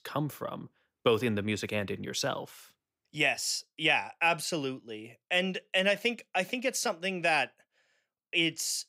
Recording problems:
none

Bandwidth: 15.5 kHz